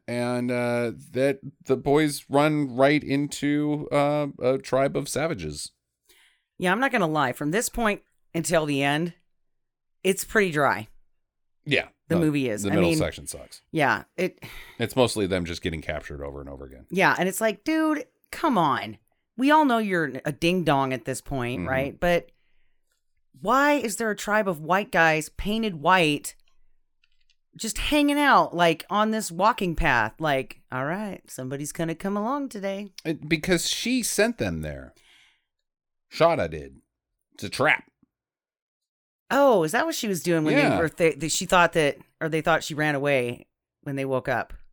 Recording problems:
none

